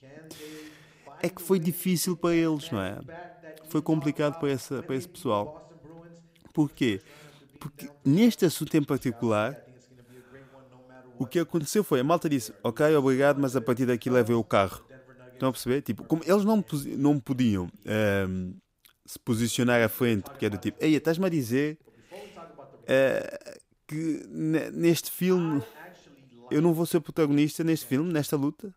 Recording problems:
voice in the background; faint; throughout; 20 dB below the speech

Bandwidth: 15.5 kHz